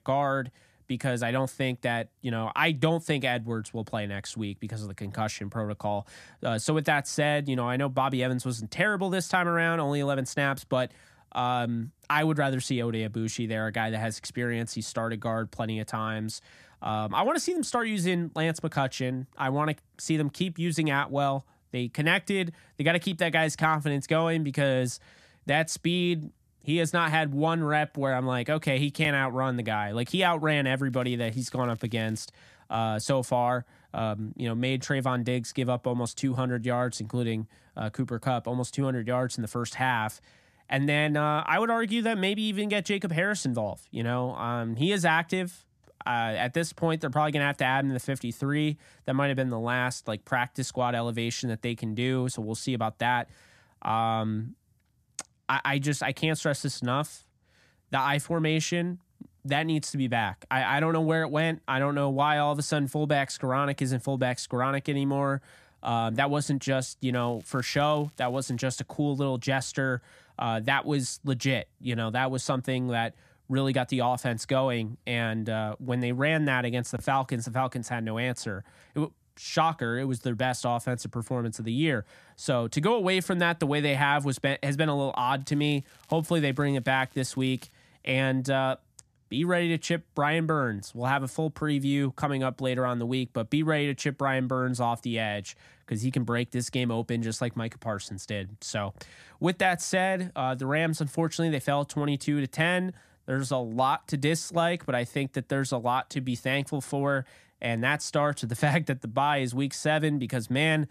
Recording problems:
crackling; faint; from 31 to 32 s, from 1:07 to 1:09 and from 1:25 to 1:28; 30 dB below the speech

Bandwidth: 14.5 kHz